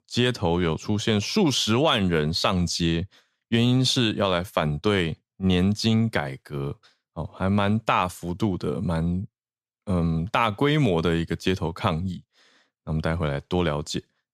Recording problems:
none

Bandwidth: 14.5 kHz